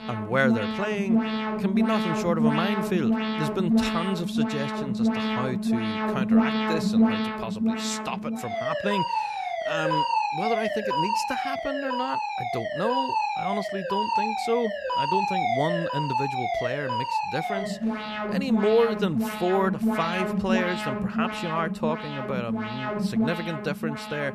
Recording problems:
alarms or sirens; very loud; throughout; 3 dB above the speech

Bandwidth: 14 kHz